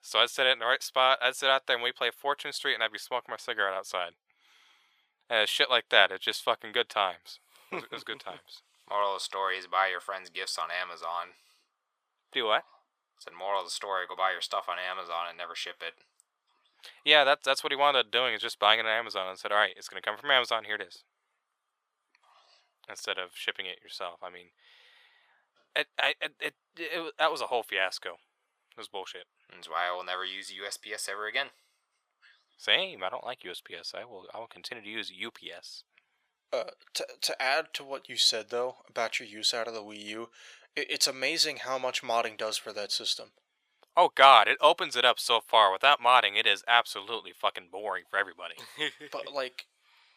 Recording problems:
thin; very; fading below 750 Hz

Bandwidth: 15 kHz